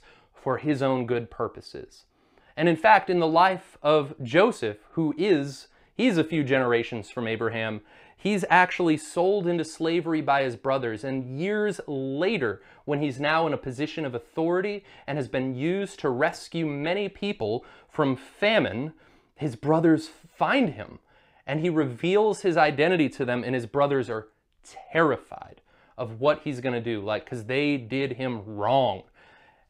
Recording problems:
none

